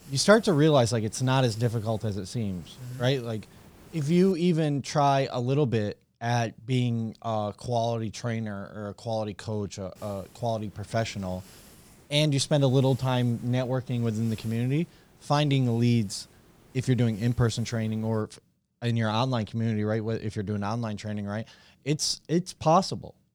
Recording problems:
hiss; faint; until 4.5 s and from 10 to 18 s; 25 dB below the speech

